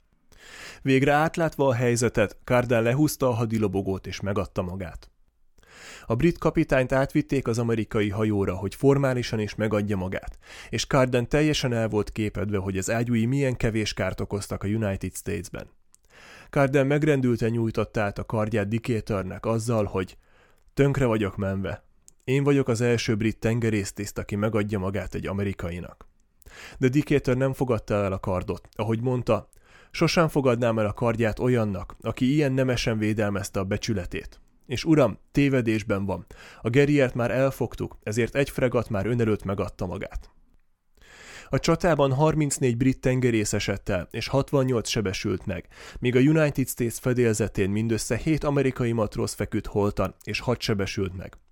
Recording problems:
none

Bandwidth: 18 kHz